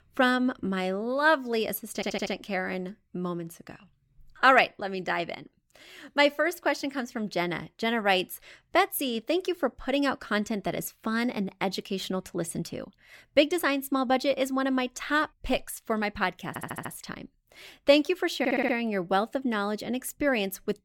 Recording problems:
audio stuttering; at 2 s, at 16 s and at 18 s

